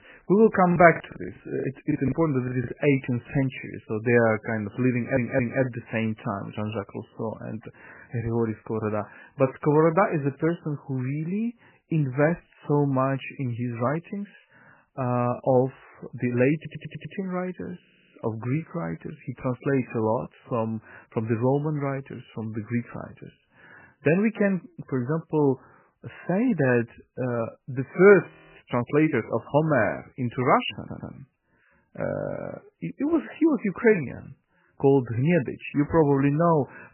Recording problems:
garbled, watery; badly; nothing above 3 kHz
choppy; very; from 0.5 to 2.5 s; 20% of the speech affected
audio stuttering; 4 times, first at 5 s
audio freezing; at 28 s

